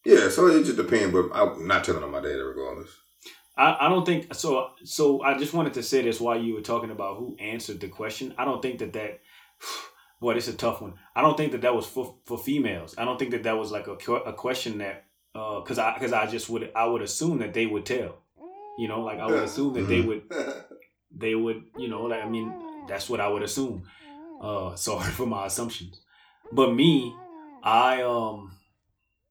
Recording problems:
room echo; very slight; dies away in 0.3 s
off-mic speech; somewhat distant
animal sounds; noticeable; throughout; 20 dB below the speech

